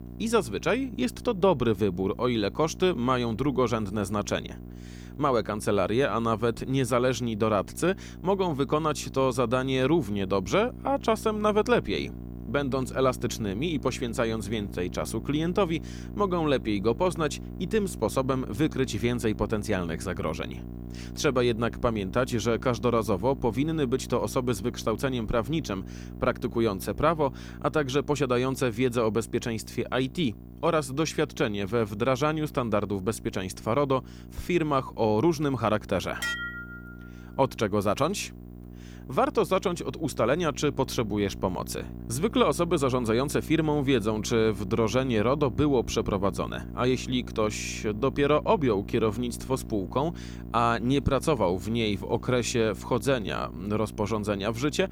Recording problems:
electrical hum; faint; throughout; 60 Hz, 20 dB below the speech
clattering dishes; noticeable; at 36 s; peak 3 dB below the speech

